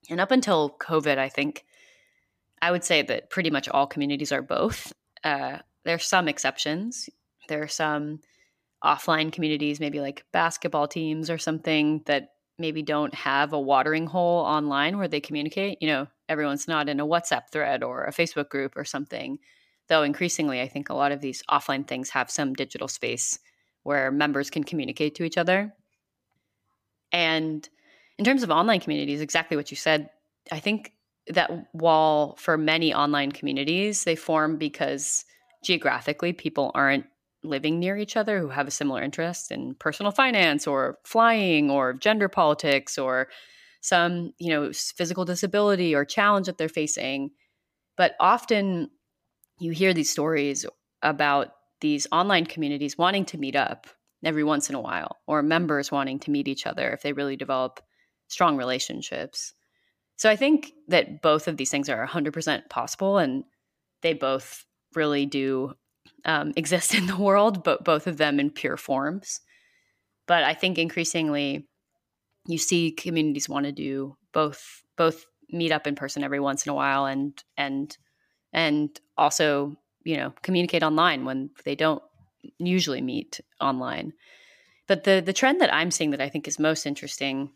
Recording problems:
none

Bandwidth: 15 kHz